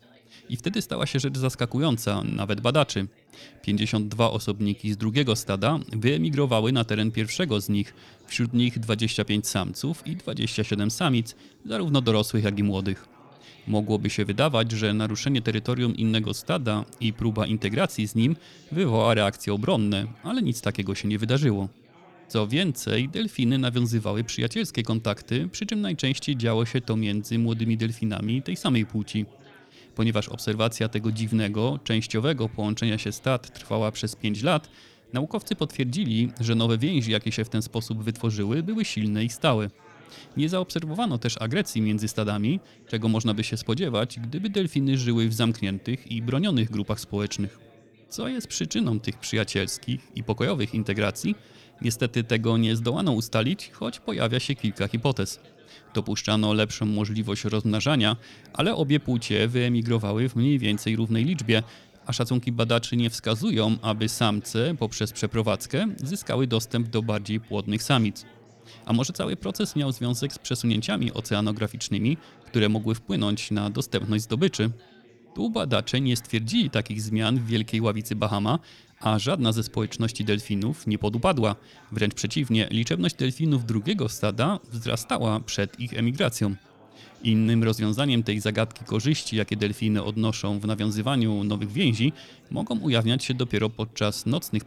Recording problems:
background chatter; faint; throughout; 4 voices, 25 dB below the speech

